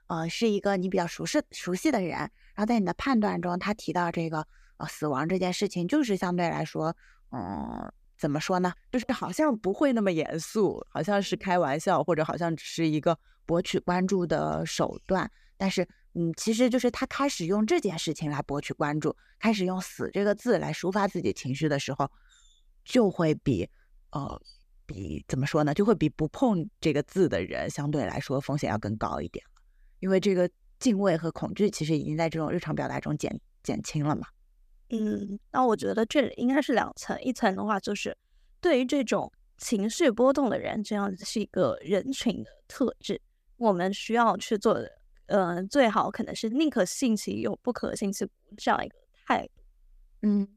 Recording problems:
none

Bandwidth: 14.5 kHz